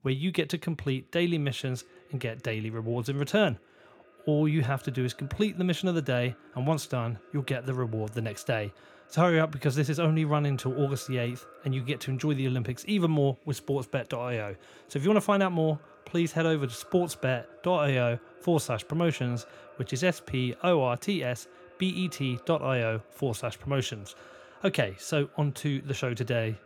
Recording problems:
echo of what is said; faint; throughout; 420 ms later, 25 dB below the speech

